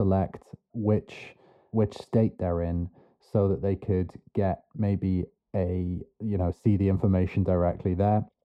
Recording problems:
muffled; very; fading above 1.5 kHz
abrupt cut into speech; at the start

